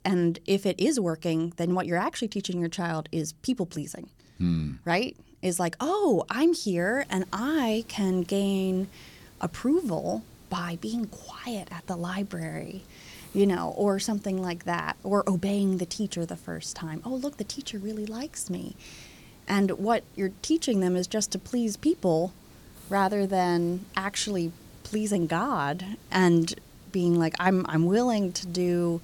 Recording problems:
hiss; faint; from 7 s on; 25 dB below the speech

